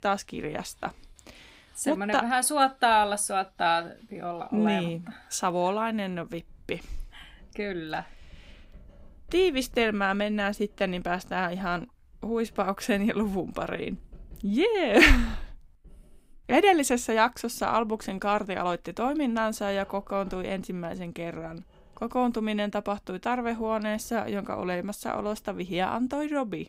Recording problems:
household noises; faint; throughout; 30 dB below the speech

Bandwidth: 15.5 kHz